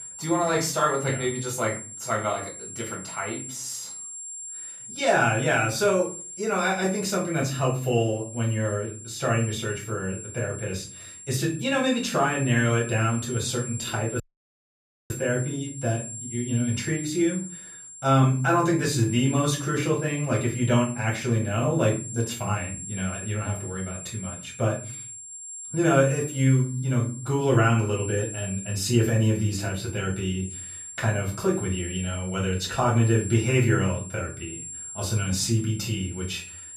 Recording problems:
off-mic speech; far
room echo; slight; dies away in 0.4 s
high-pitched whine; noticeable; throughout; 7.5 kHz, 10 dB below the speech
audio cutting out; at 14 s for 1 s

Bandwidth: 14.5 kHz